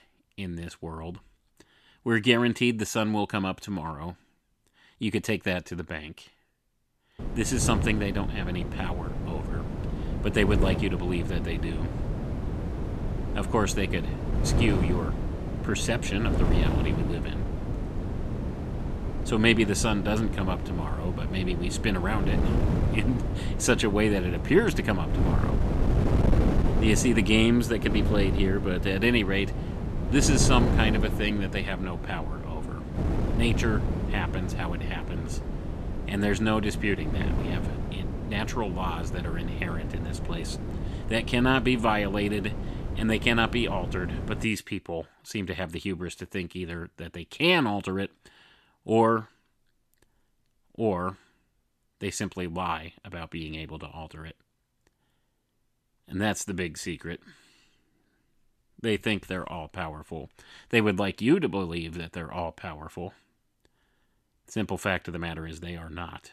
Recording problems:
wind noise on the microphone; heavy; from 7 to 44 s; 8 dB below the speech

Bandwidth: 14 kHz